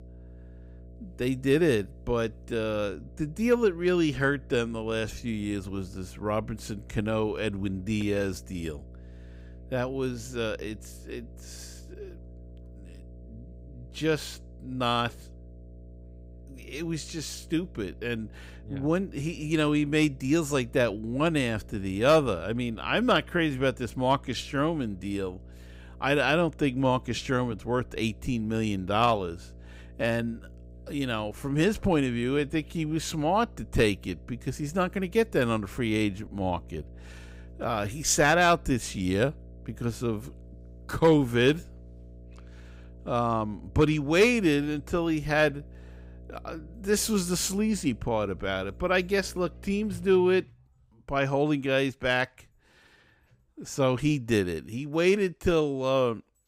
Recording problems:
electrical hum; faint; until 50 s; 60 Hz, 30 dB below the speech

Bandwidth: 15.5 kHz